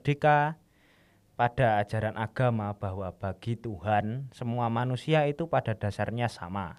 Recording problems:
none

